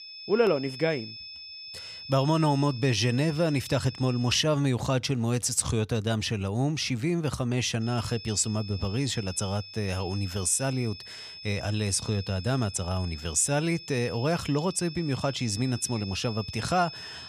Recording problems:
high-pitched whine; noticeable; until 4.5 s and from 8 s on; 5 kHz, 15 dB below the speech

